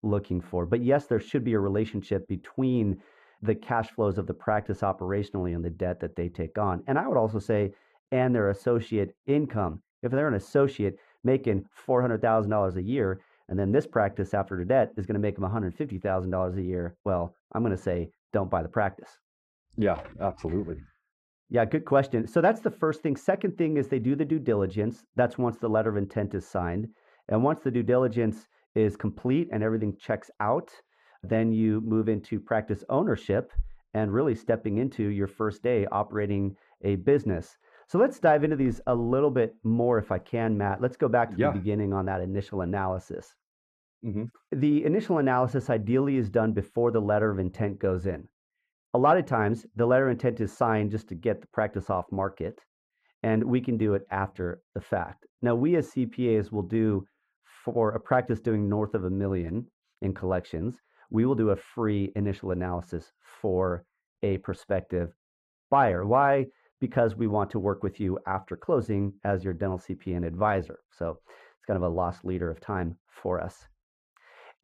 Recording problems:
muffled; very; fading above 2.5 kHz

